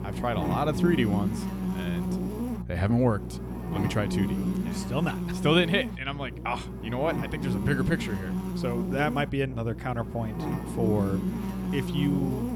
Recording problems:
electrical hum; loud; throughout; 60 Hz, 7 dB below the speech

